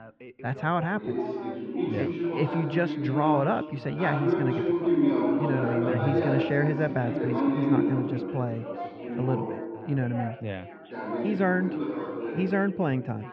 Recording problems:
muffled; very; fading above 3 kHz
chatter from many people; loud; throughout; as loud as the speech

